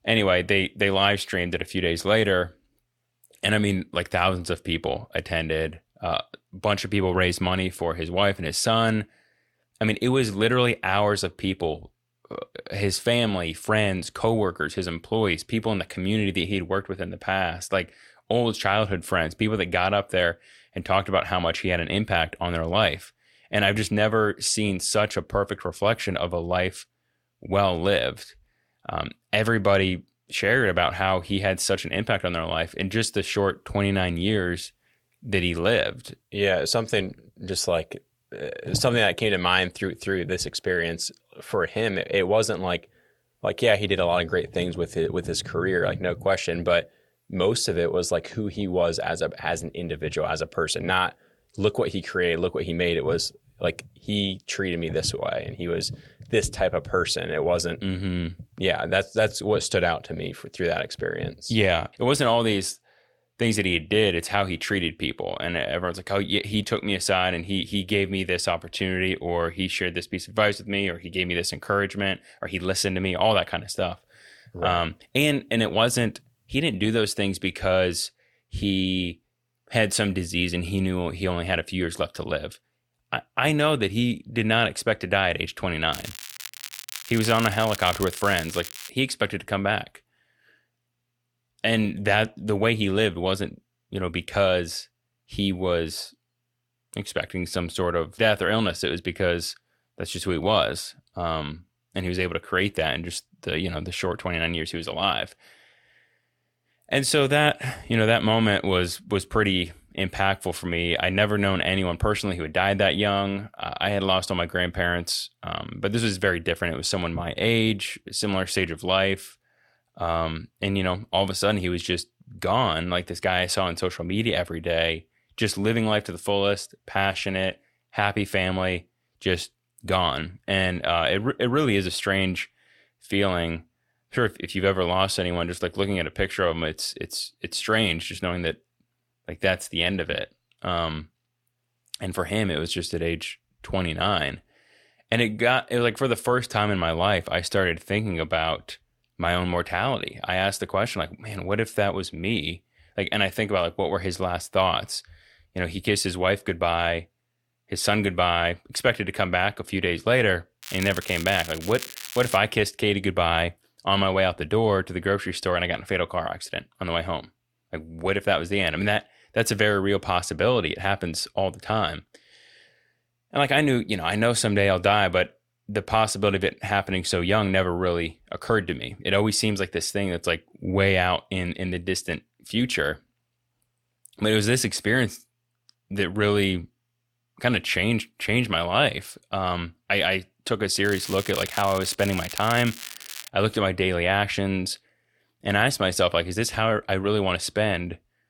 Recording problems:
crackling; noticeable; from 1:26 to 1:29, from 2:41 to 2:42 and from 3:11 to 3:13; 10 dB below the speech

